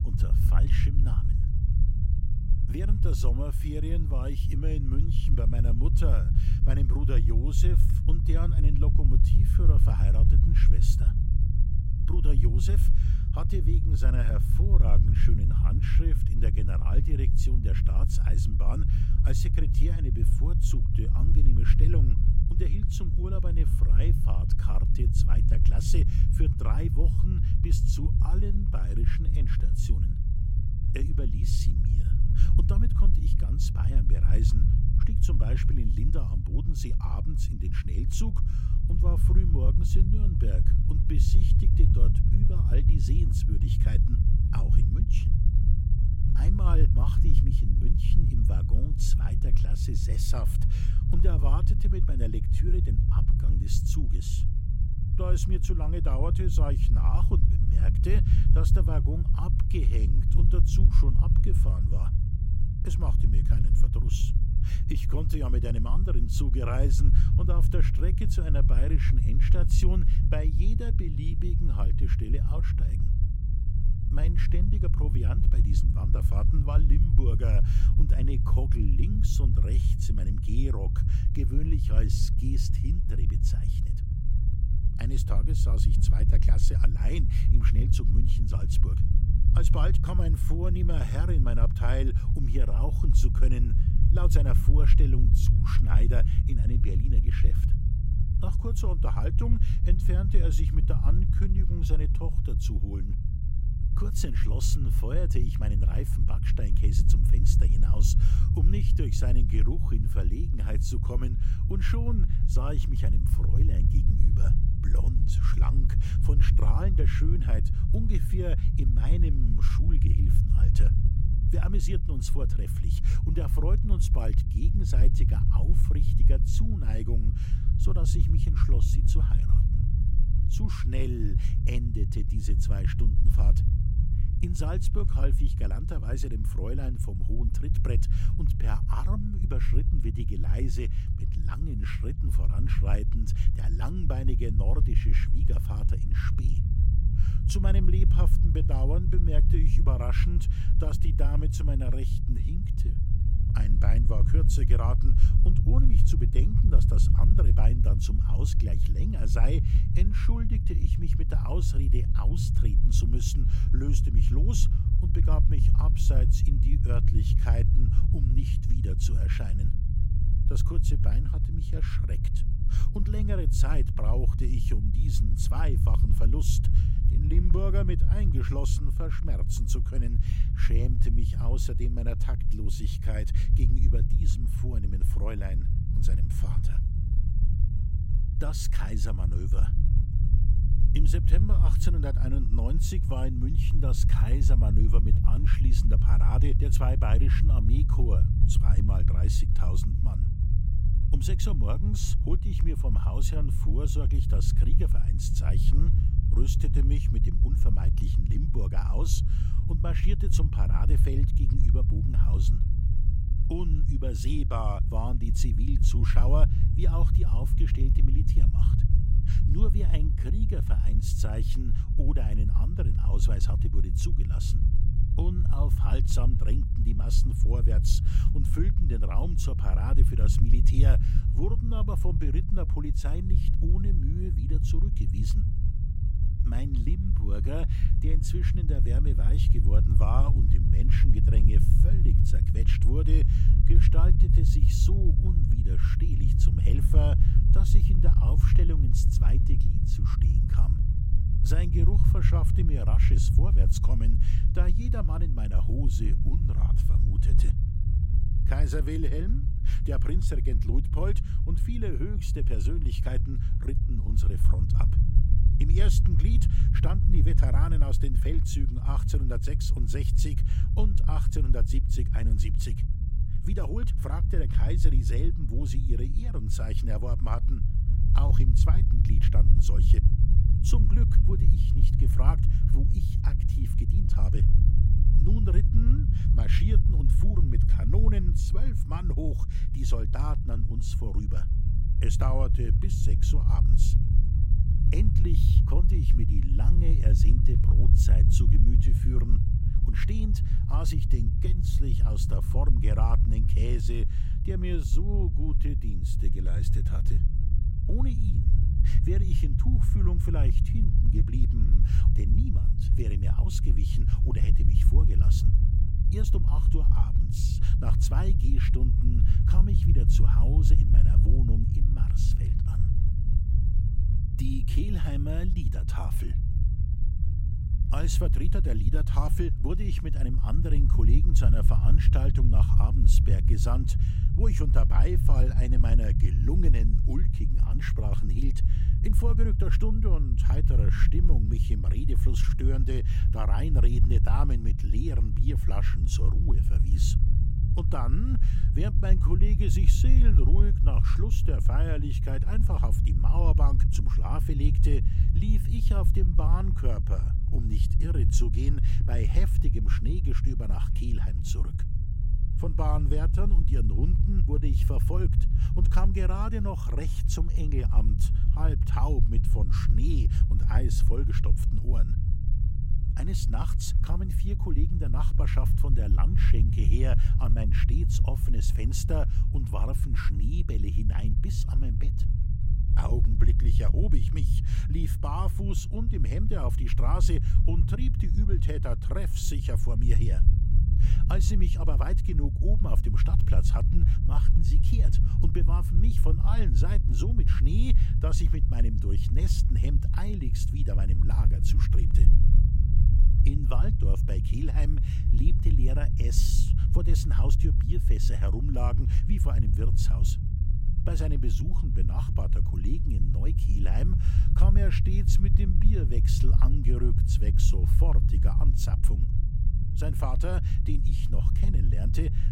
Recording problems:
low rumble; loud; throughout; 2 dB below the speech

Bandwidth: 16 kHz